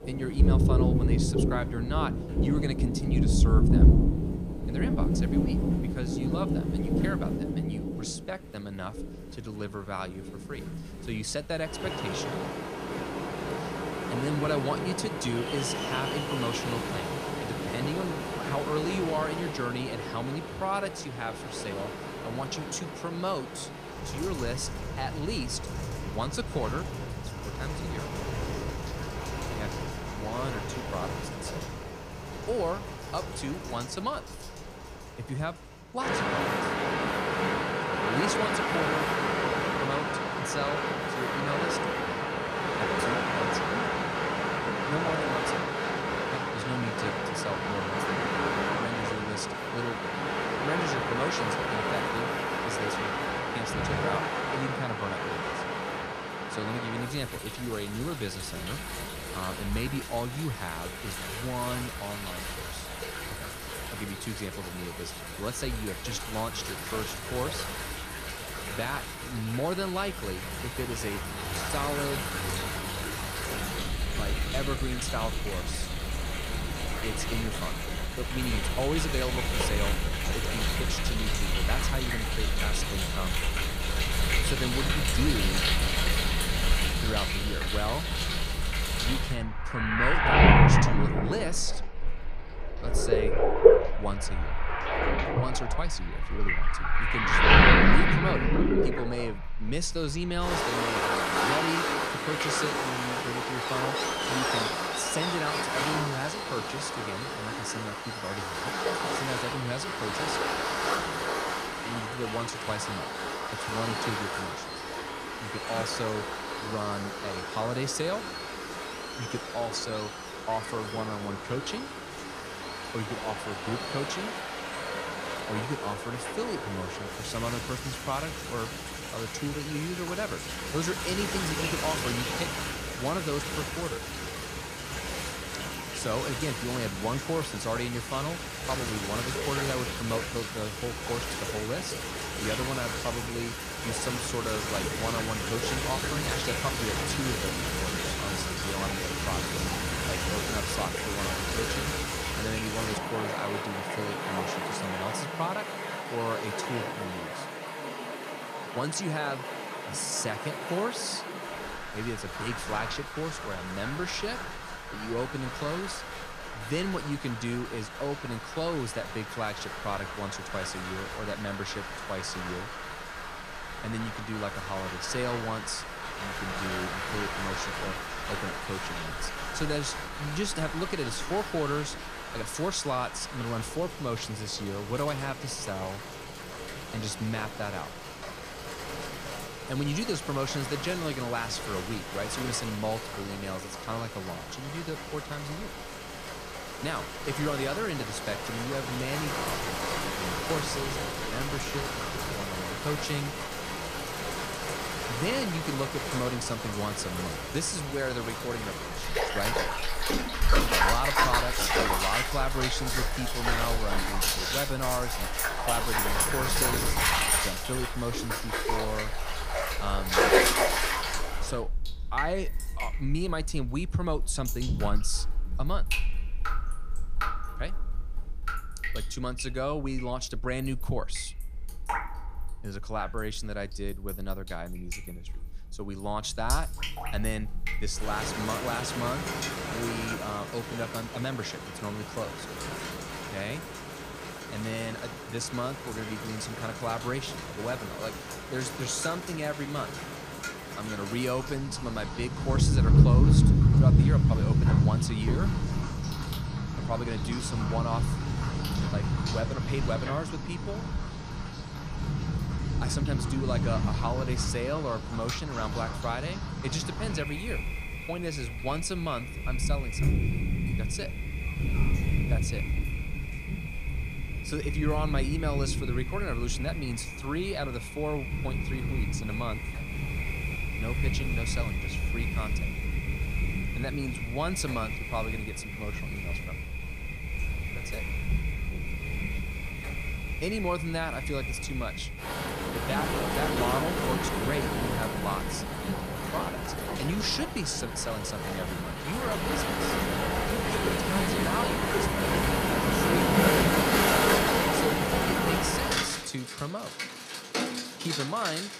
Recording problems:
rain or running water; very loud; throughout; 4 dB above the speech

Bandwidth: 15 kHz